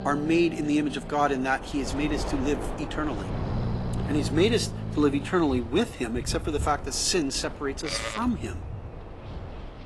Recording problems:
garbled, watery; slightly; nothing above 11.5 kHz
animal sounds; loud; throughout; 9 dB below the speech
wind noise on the microphone; occasional gusts; 15 dB below the speech

